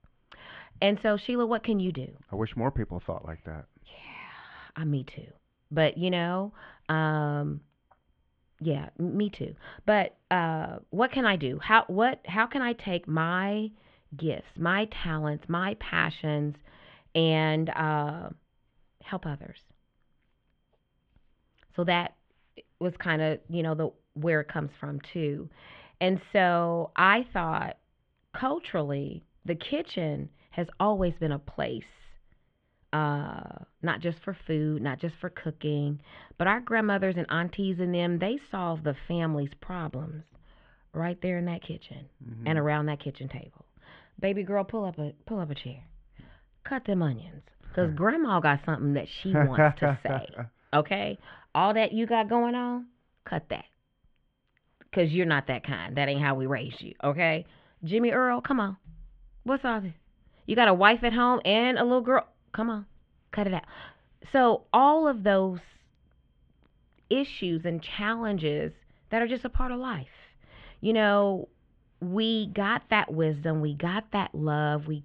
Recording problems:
muffled; very; fading above 3 kHz

